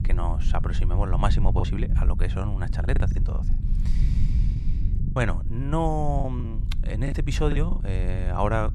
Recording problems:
low rumble; noticeable; throughout; 10 dB below the speech
choppy; very; 6% of the speech affected

